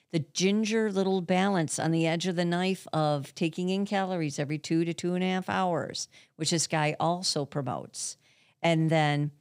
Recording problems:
none

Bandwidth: 15.5 kHz